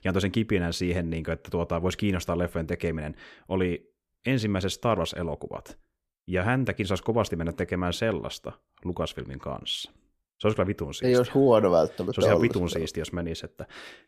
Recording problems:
none

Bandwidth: 14.5 kHz